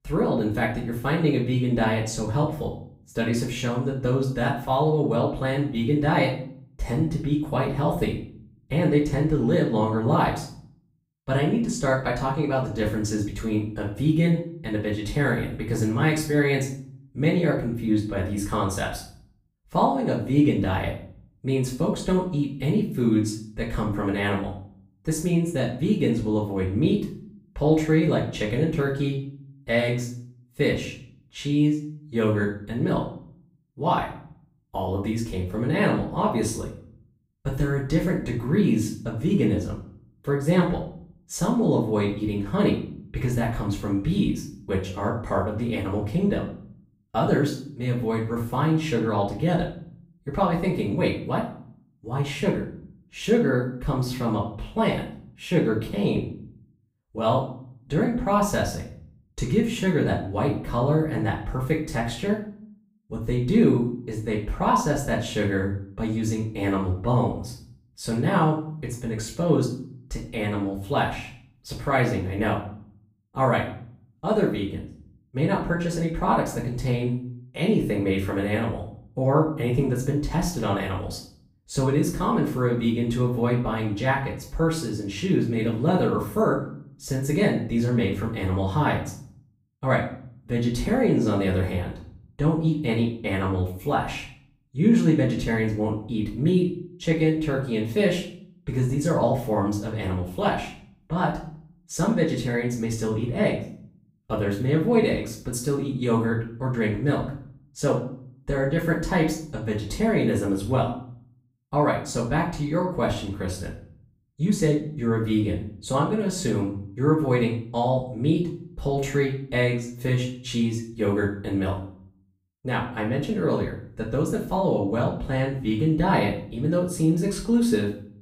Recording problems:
off-mic speech; far
room echo; slight; dies away in 0.4 s

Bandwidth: 15.5 kHz